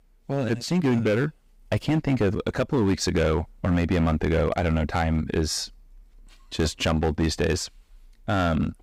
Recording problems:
distortion; slight; 8% of the sound clipped

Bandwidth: 15.5 kHz